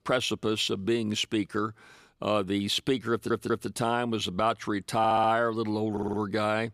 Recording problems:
audio stuttering; at 3 s, at 5 s and at 6 s

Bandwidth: 15 kHz